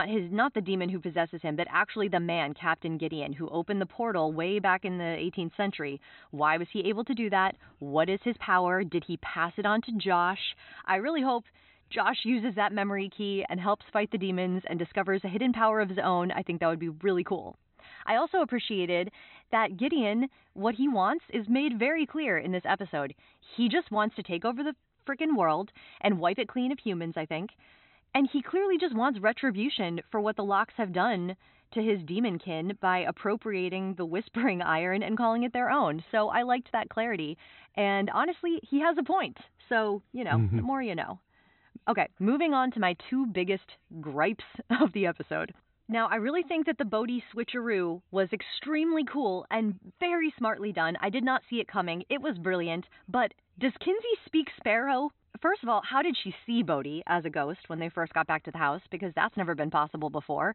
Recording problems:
high frequencies cut off; severe; nothing above 4 kHz
abrupt cut into speech; at the start

